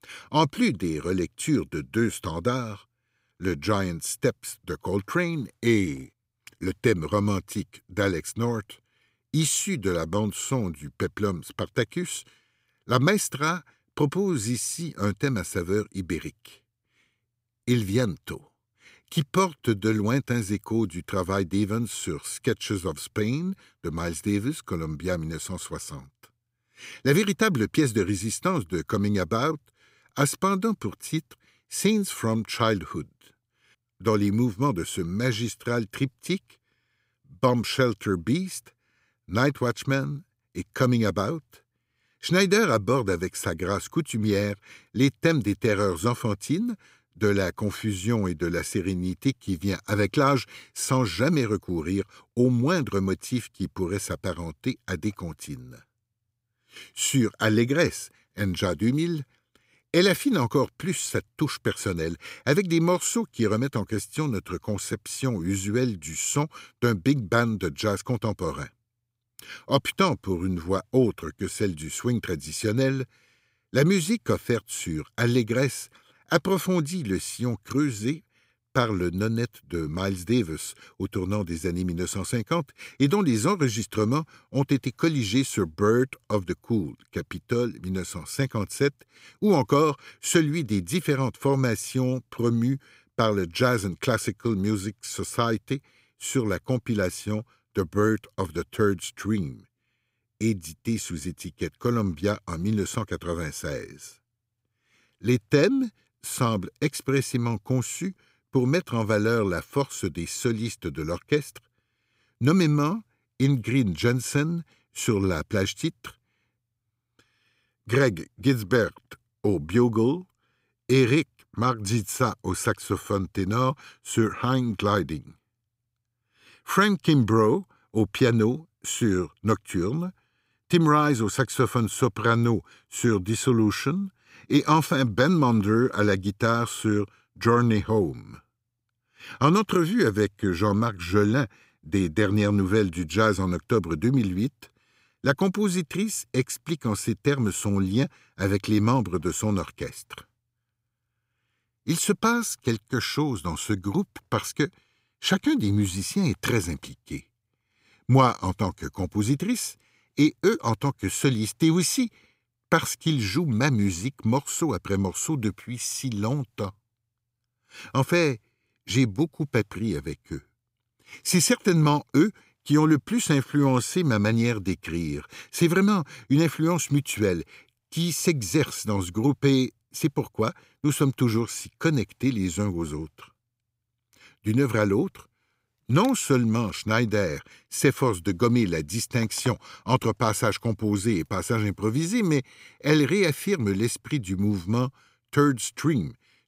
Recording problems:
none

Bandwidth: 15.5 kHz